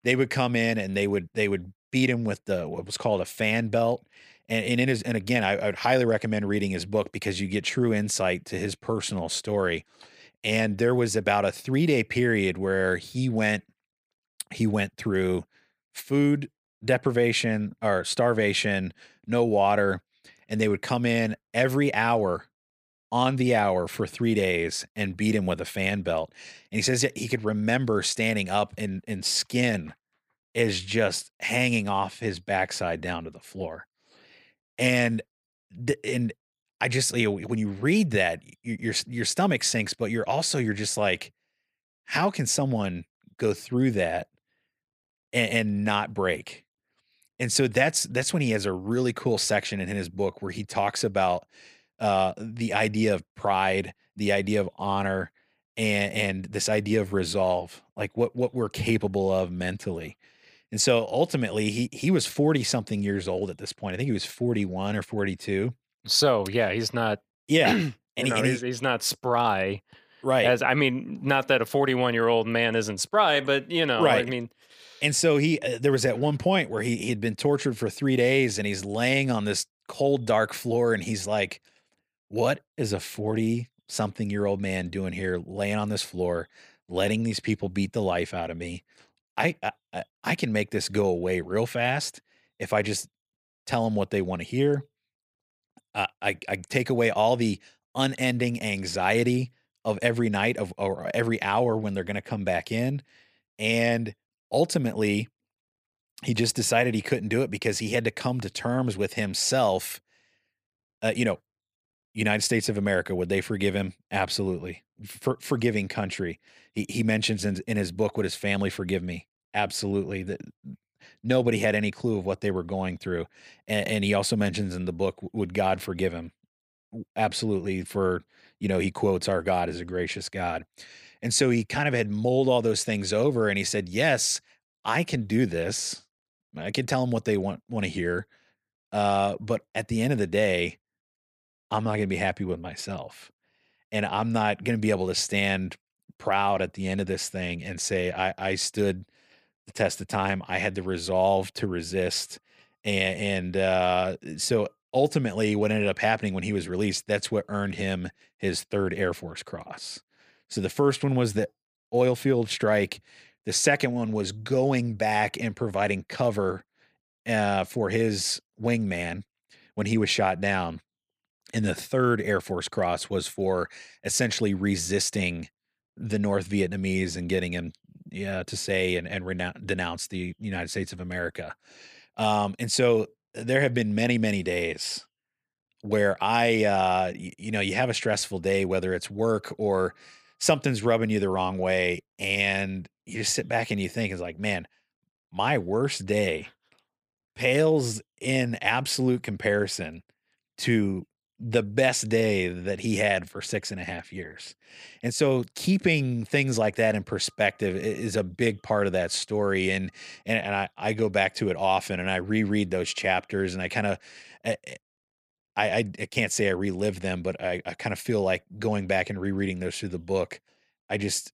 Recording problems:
none

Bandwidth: 15 kHz